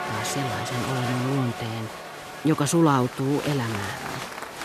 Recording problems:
crowd noise; loud; throughout; 7 dB below the speech
hiss; faint; throughout; 25 dB below the speech

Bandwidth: 14 kHz